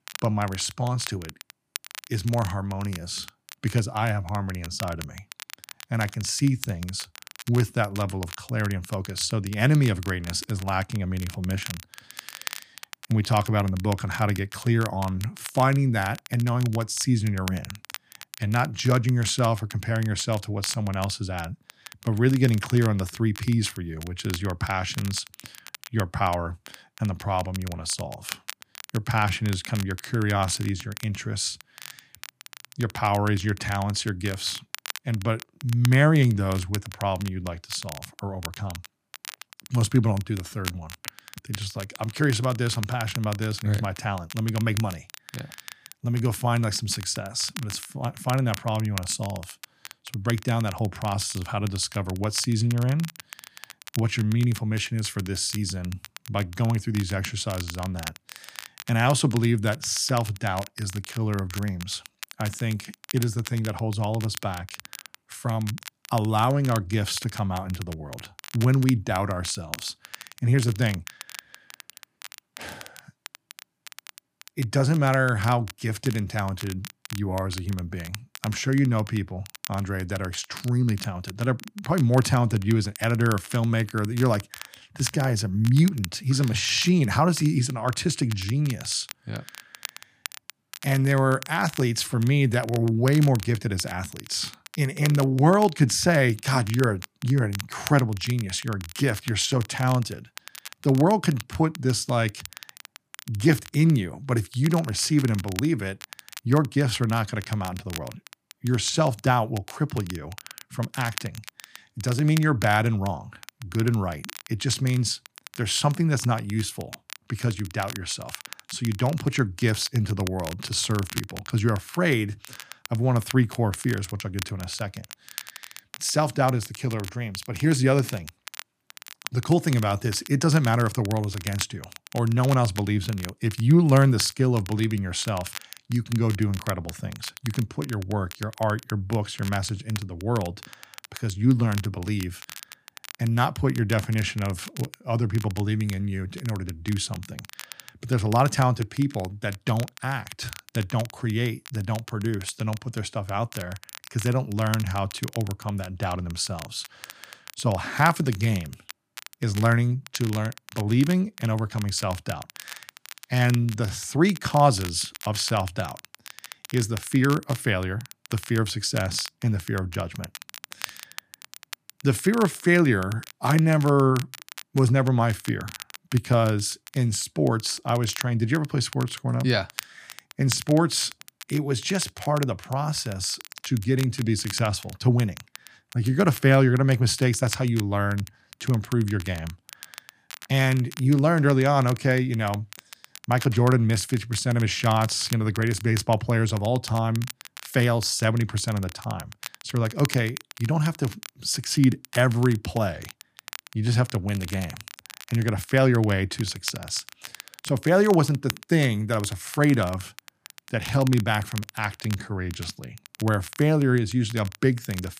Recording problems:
crackle, like an old record; noticeable; 15 dB below the speech

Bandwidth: 15 kHz